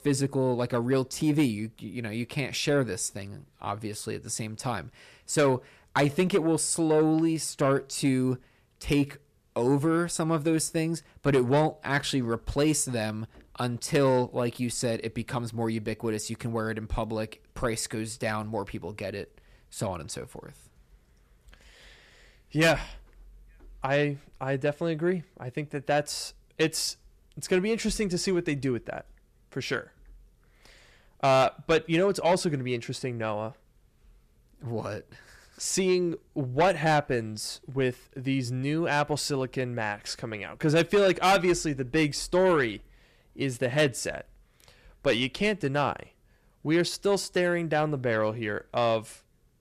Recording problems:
distortion; slight; 10 dB below the speech

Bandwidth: 14.5 kHz